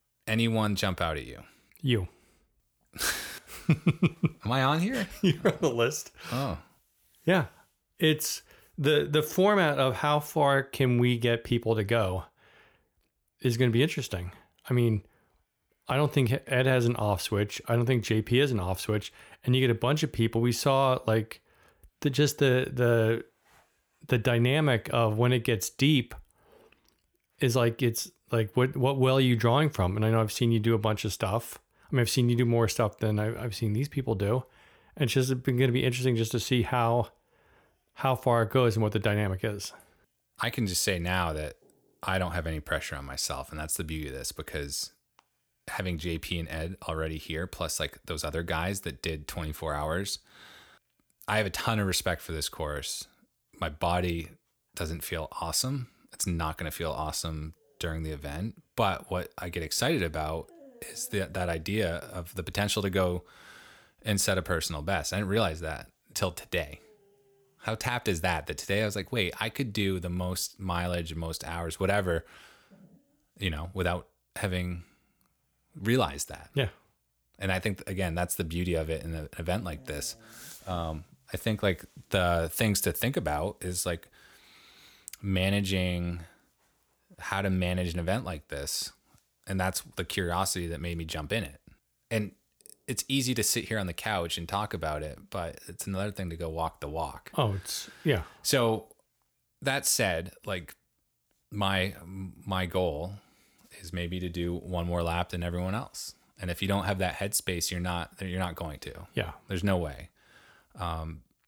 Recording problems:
none

